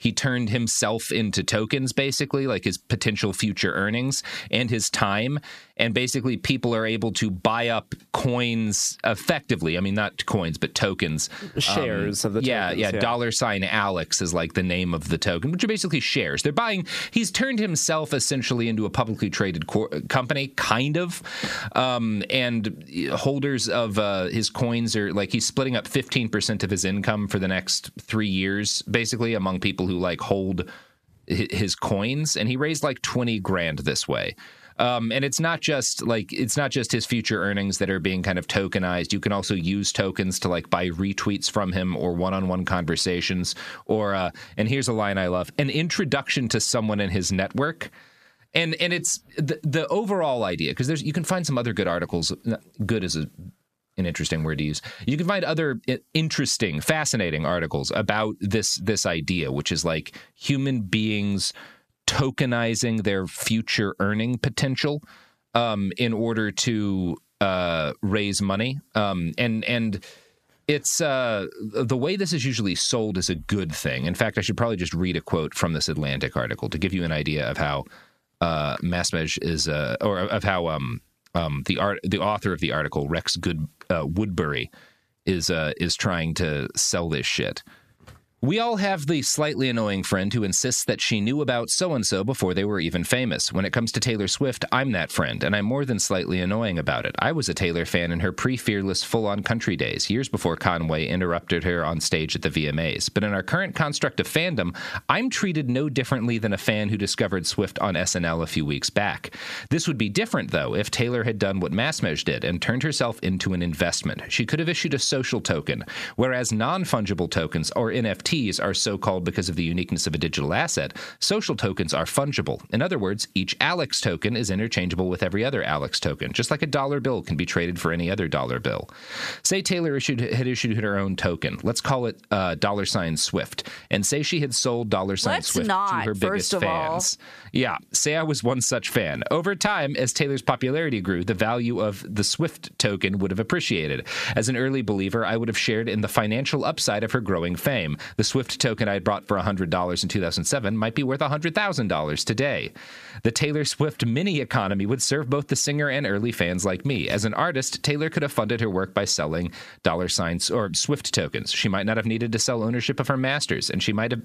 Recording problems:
squashed, flat; heavily

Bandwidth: 14.5 kHz